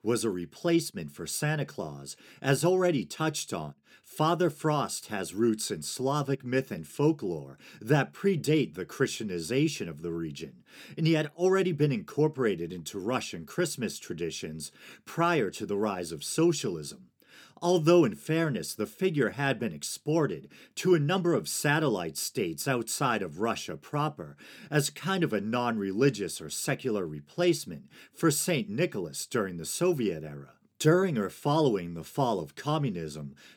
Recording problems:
none

